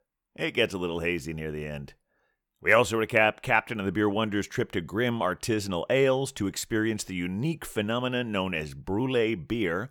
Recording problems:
none

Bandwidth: 18.5 kHz